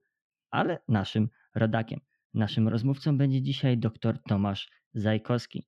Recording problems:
muffled; slightly; fading above 2.5 kHz

